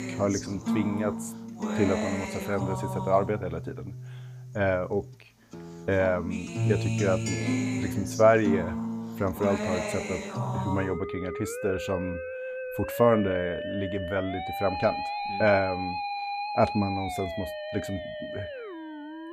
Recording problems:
background music; loud; throughout; 4 dB below the speech

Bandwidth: 15 kHz